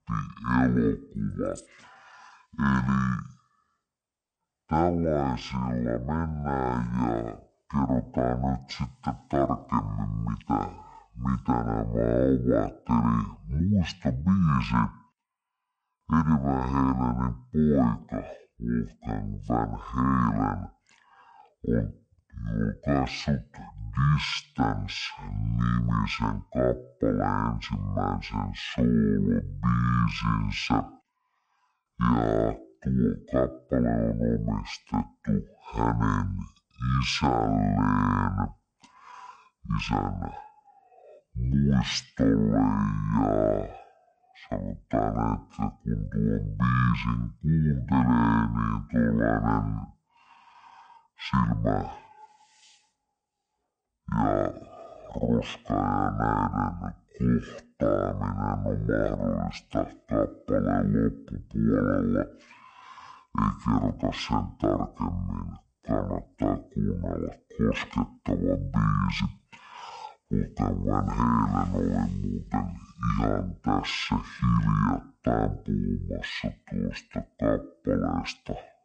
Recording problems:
wrong speed and pitch; too slow and too low; 0.5 times normal speed

